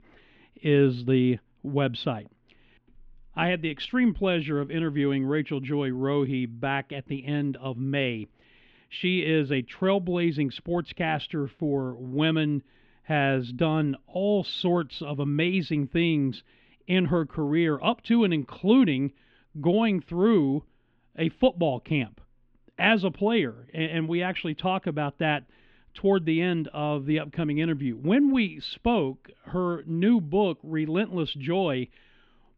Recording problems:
muffled; slightly; fading above 3 kHz

